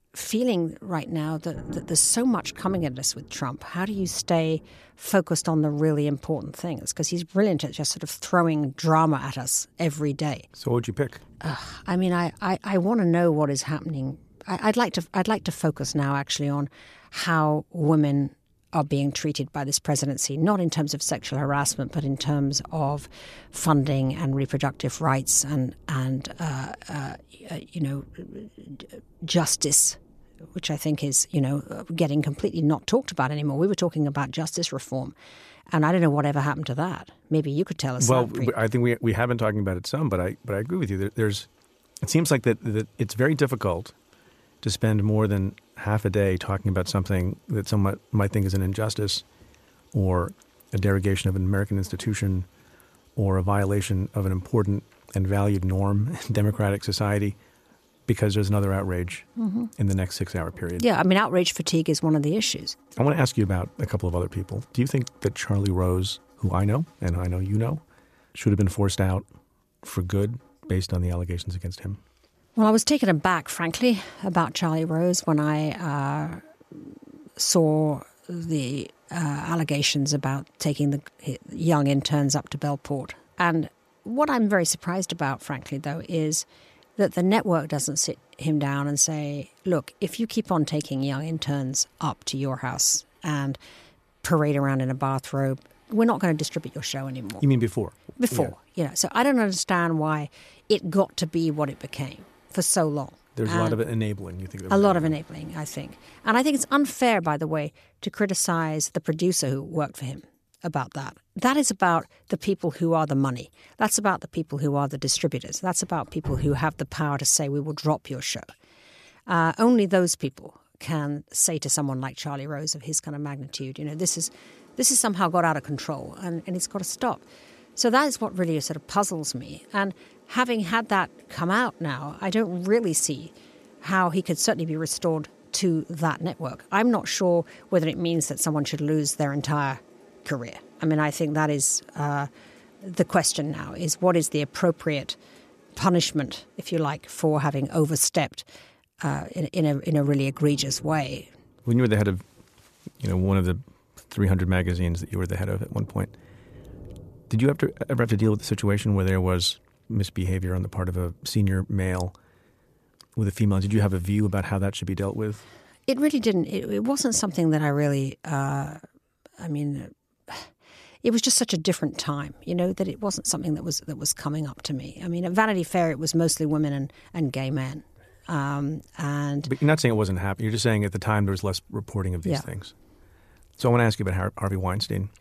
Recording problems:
rain or running water; faint; throughout; 30 dB below the speech

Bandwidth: 14.5 kHz